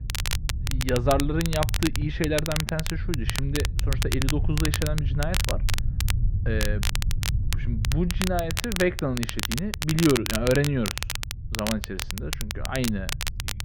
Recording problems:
muffled; very; fading above 2 kHz
crackle, like an old record; loud; 4 dB below the speech
low rumble; noticeable; throughout; 15 dB below the speech

